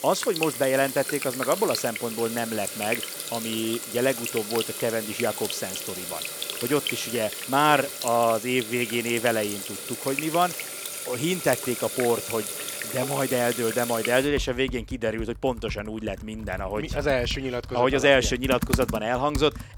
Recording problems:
household noises; loud; throughout; 6 dB below the speech

